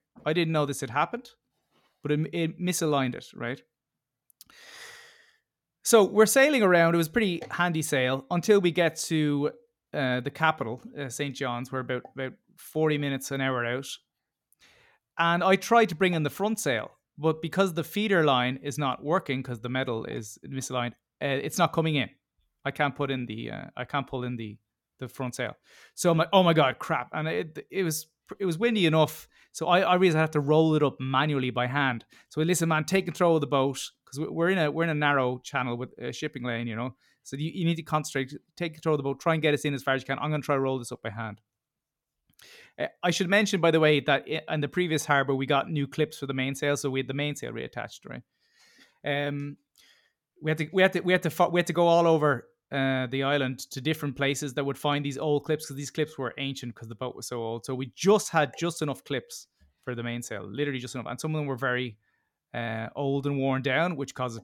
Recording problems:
none

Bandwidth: 17 kHz